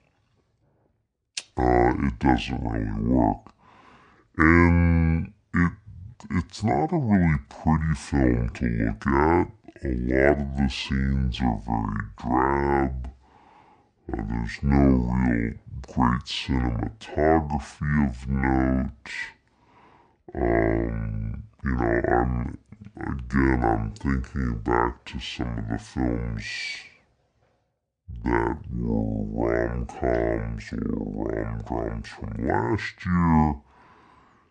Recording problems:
wrong speed and pitch; too slow and too low; 0.5 times normal speed

